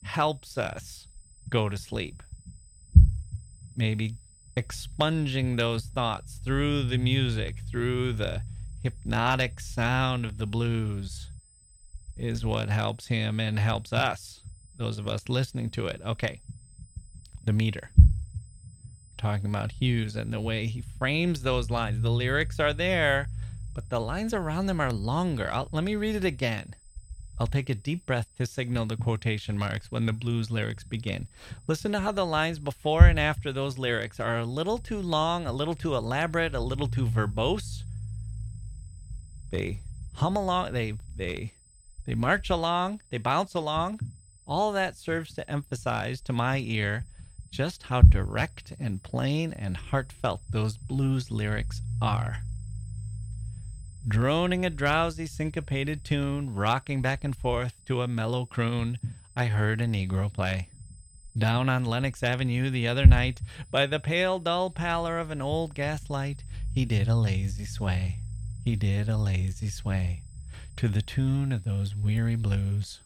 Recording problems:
low rumble; noticeable; throughout; 15 dB below the speech
high-pitched whine; faint; throughout; 8 kHz, 25 dB below the speech

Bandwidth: 18.5 kHz